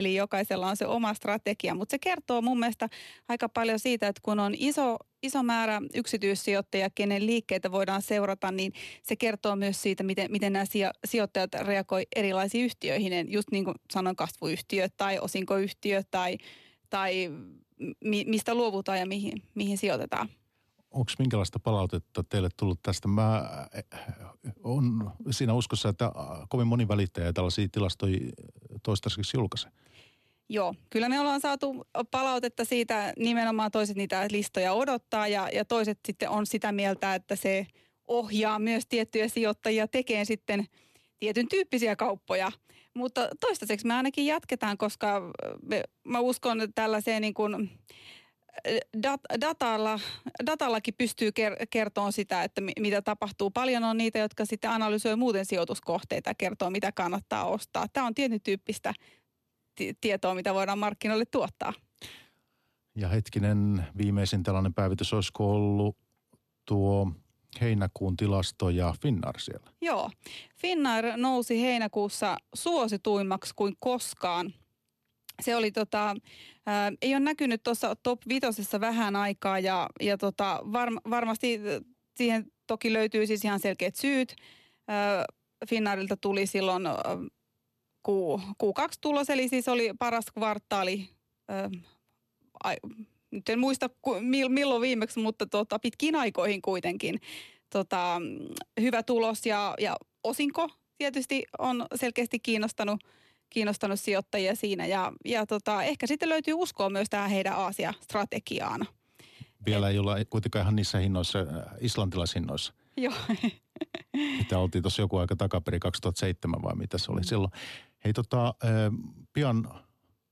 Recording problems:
abrupt cut into speech; at the start

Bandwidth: 13.5 kHz